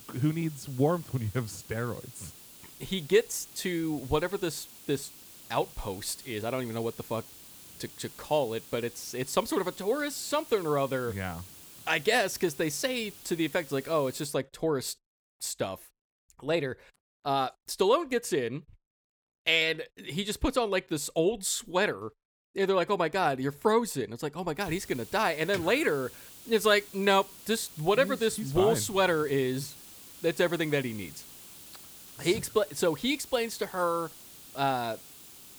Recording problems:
hiss; noticeable; until 14 s and from 25 s on; 15 dB below the speech

